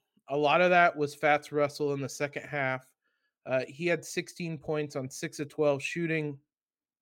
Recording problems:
none

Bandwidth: 16.5 kHz